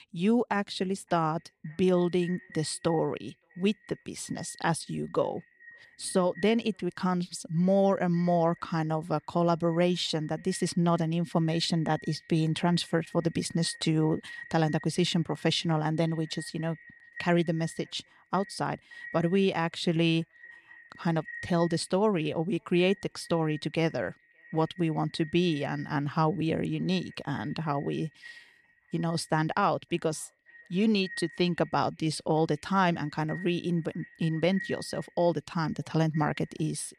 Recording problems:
echo of what is said; faint; throughout; 570 ms later, 20 dB below the speech

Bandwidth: 14 kHz